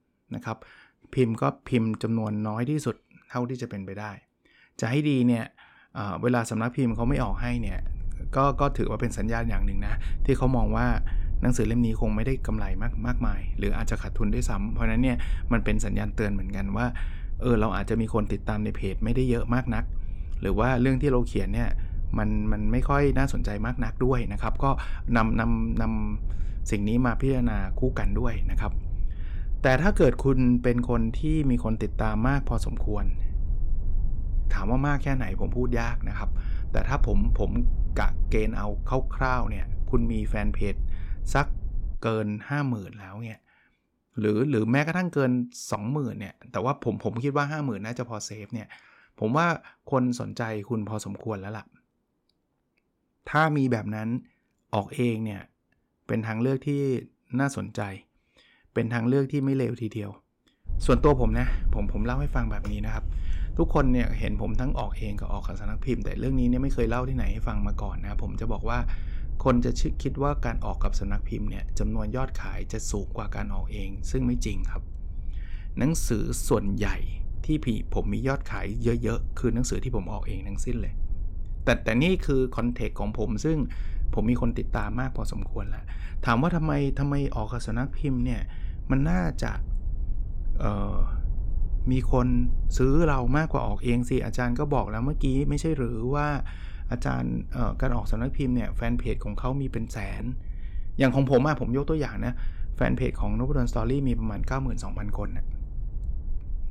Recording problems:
low rumble; faint; from 7 to 42 s and from 1:01 on; 25 dB below the speech

